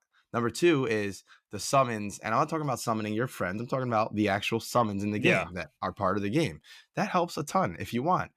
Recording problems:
none

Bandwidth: 14.5 kHz